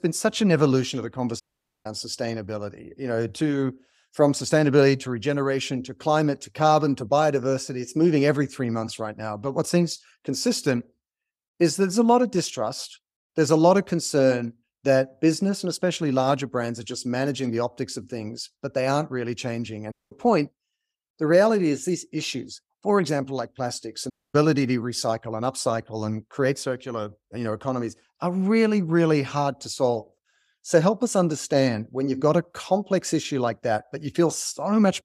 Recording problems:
audio cutting out; at 1.5 s, at 20 s and at 24 s

